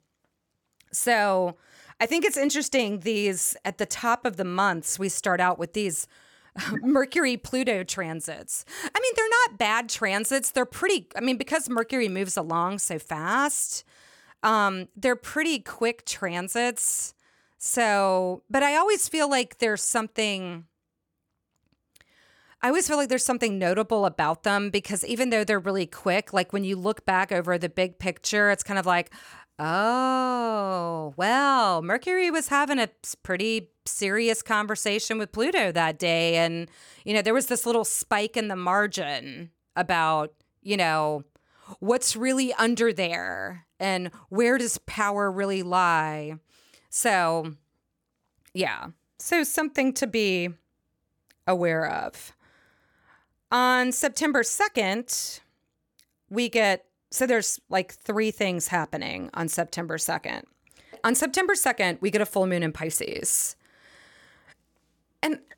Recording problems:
none

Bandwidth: 18 kHz